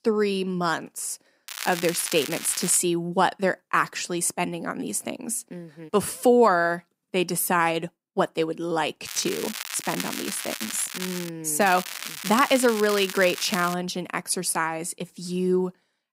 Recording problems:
crackling; loud; from 1.5 to 3 s, from 9 to 11 s and from 12 to 14 s; 8 dB below the speech

